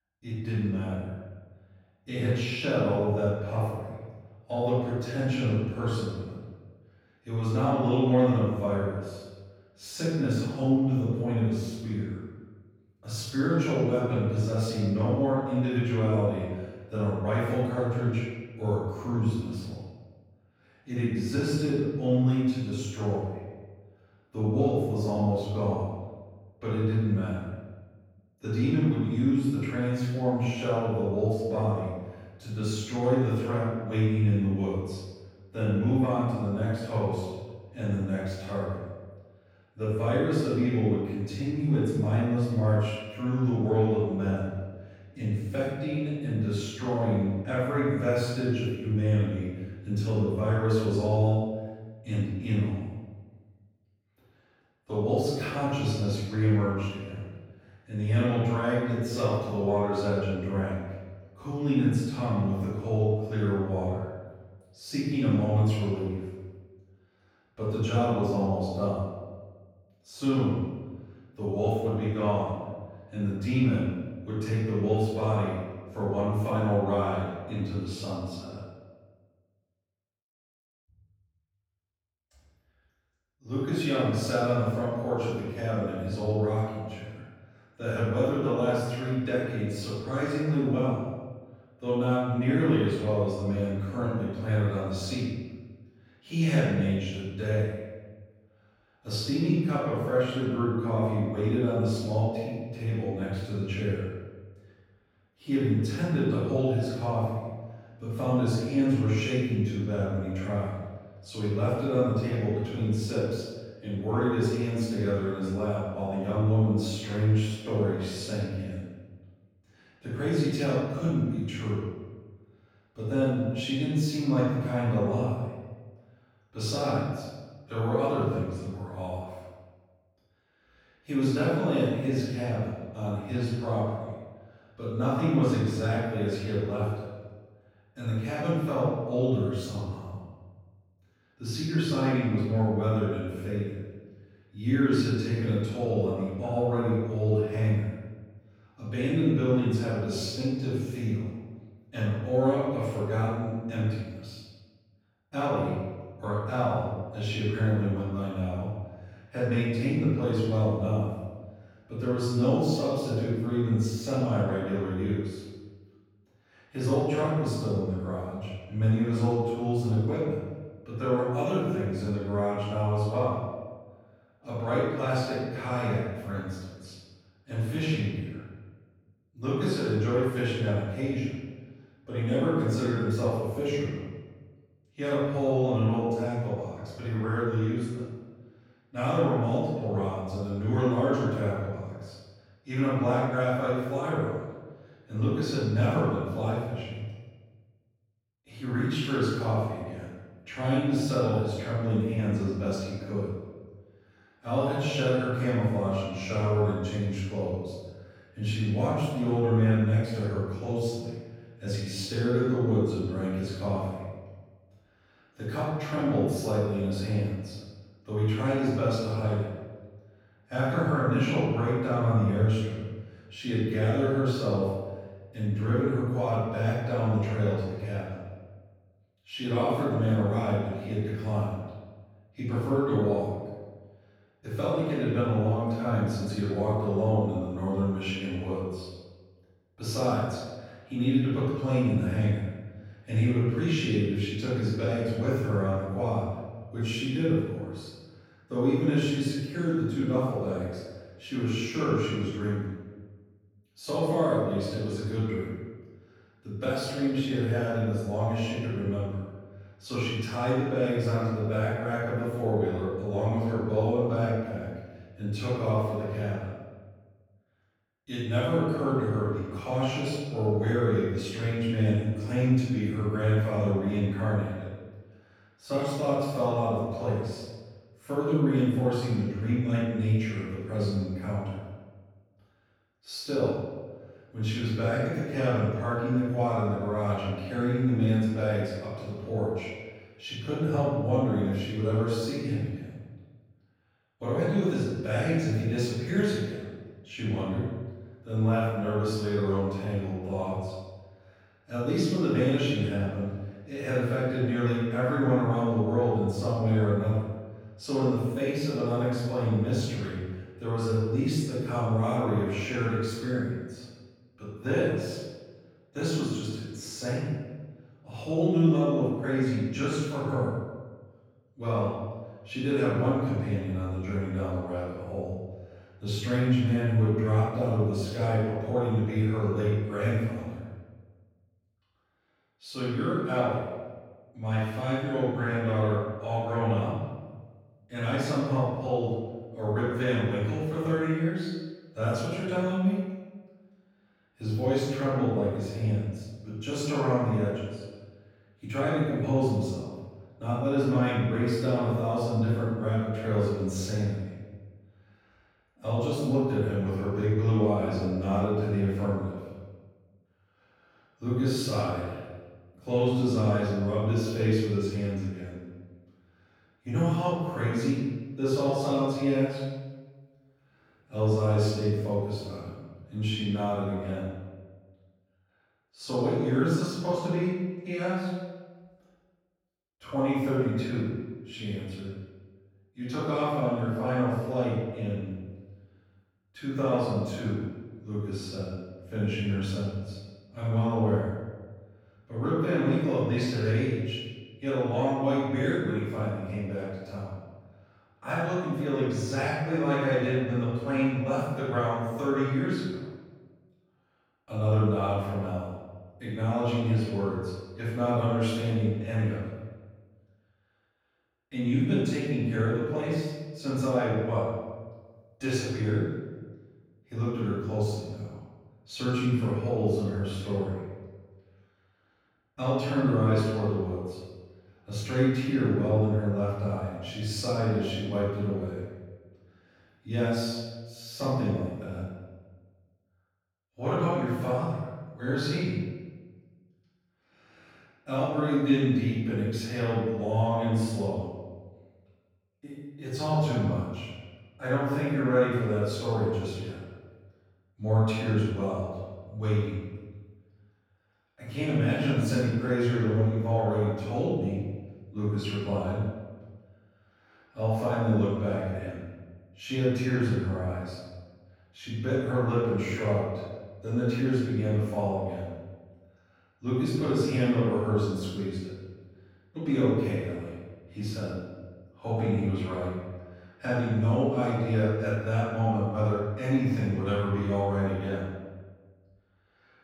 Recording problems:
room echo; strong; dies away in 1.2 s
off-mic speech; far

